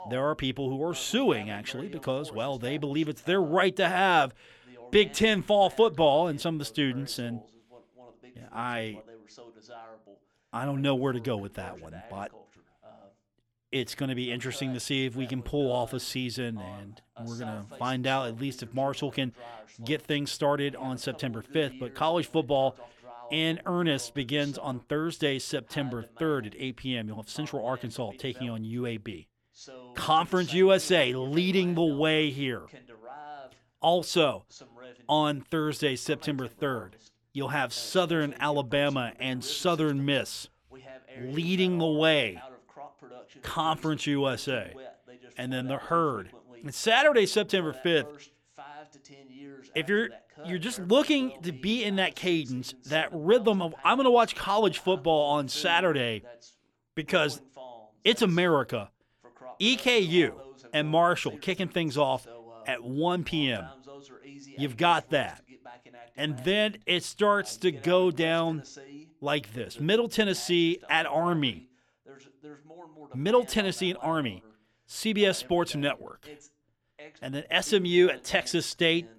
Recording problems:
voice in the background; faint; throughout; 20 dB below the speech

